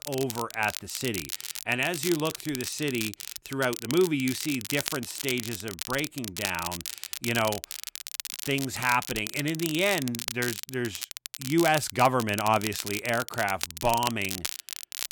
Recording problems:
crackle, like an old record; loud; 6 dB below the speech

